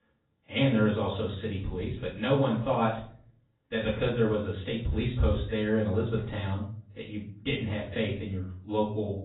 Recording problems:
off-mic speech; far
garbled, watery; badly; nothing above 4 kHz
room echo; slight; dies away in 0.4 s

